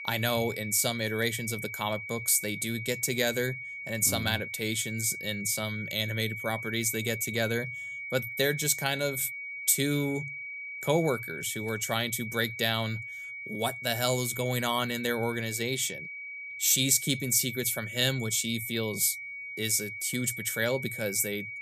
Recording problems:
high-pitched whine; loud; throughout; 2.5 kHz, 8 dB below the speech

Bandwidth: 14.5 kHz